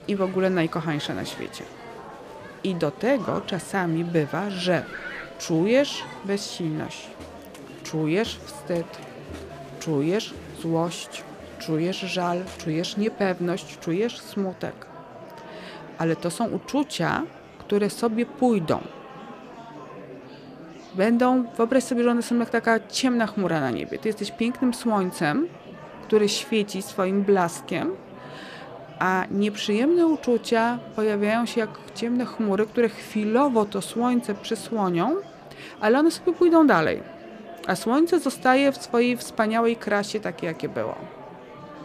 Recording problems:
murmuring crowd; noticeable; throughout; 15 dB below the speech

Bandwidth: 14.5 kHz